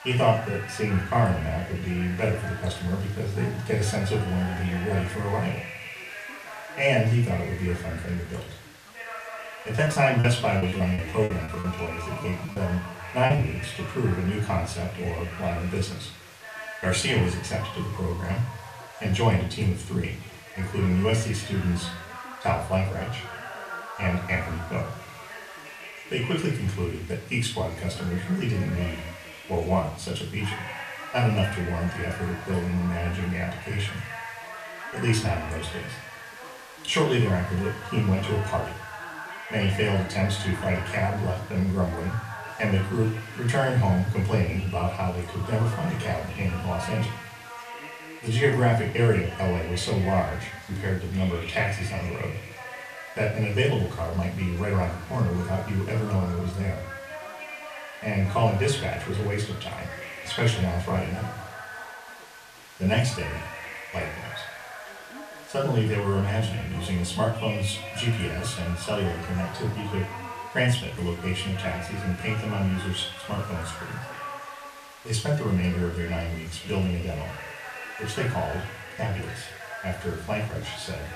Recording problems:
off-mic speech; far
room echo; slight; dies away in 0.4 s
background chatter; noticeable; throughout; 2 voices, 10 dB below the speech
hiss; faint; throughout; 20 dB below the speech
choppy; very; from 10 to 13 s; 16% of the speech affected

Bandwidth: 14.5 kHz